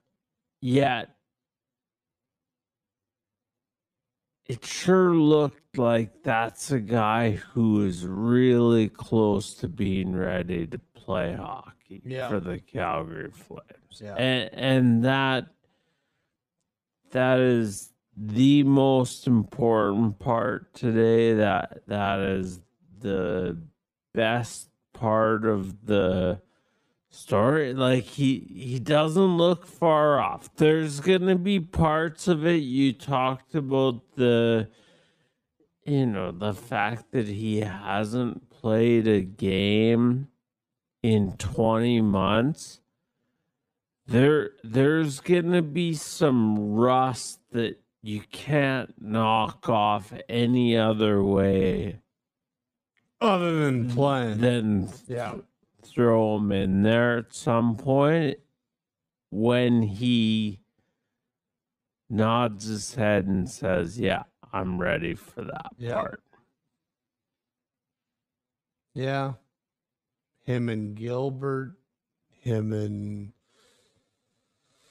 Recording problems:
wrong speed, natural pitch; too slow; 0.5 times normal speed

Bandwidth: 15 kHz